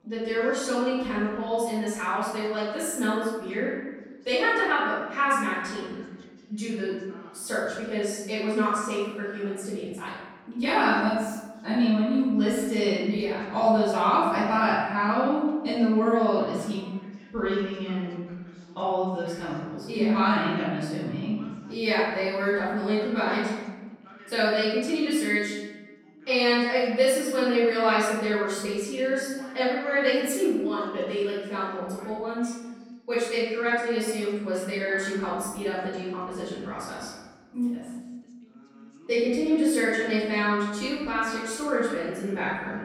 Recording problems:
room echo; strong; dies away in 1.1 s
off-mic speech; far
background chatter; faint; throughout; 2 voices, 25 dB below the speech

